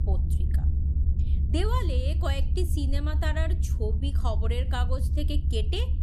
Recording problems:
low rumble; loud; throughout; 9 dB below the speech

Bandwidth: 14 kHz